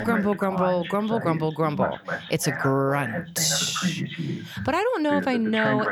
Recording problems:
voice in the background; loud; throughout; 6 dB below the speech

